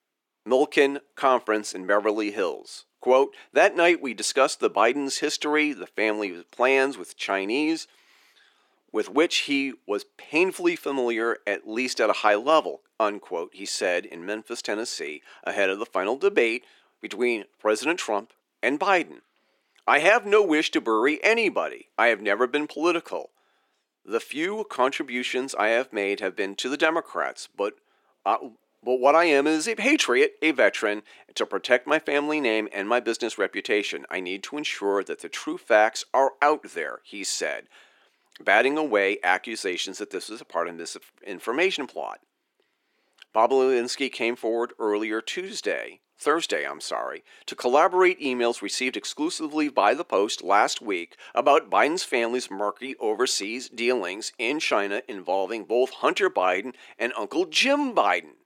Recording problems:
thin; somewhat; fading below 300 Hz

